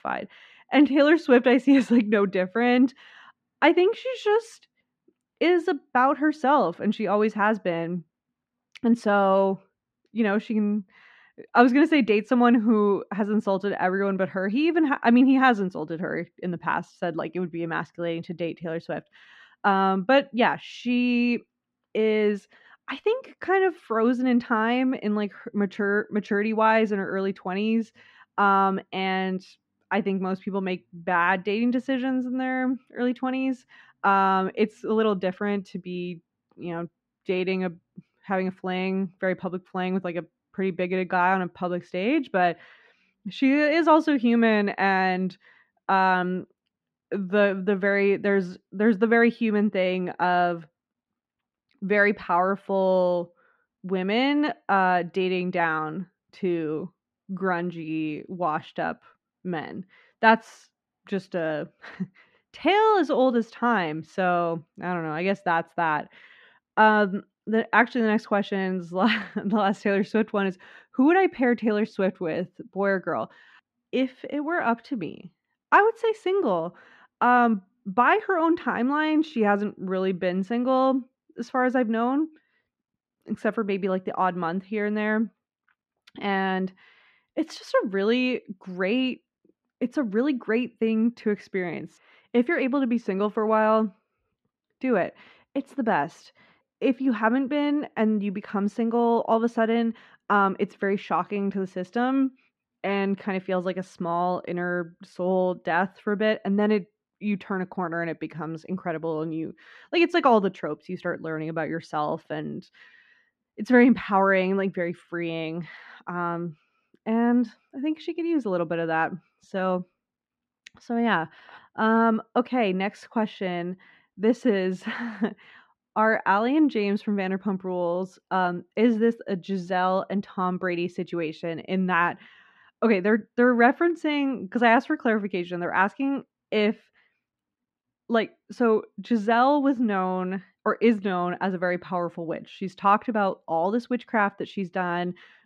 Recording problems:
muffled; slightly; fading above 3 kHz

